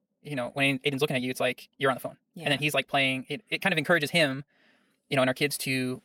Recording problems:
wrong speed, natural pitch; too fast; 1.6 times normal speed

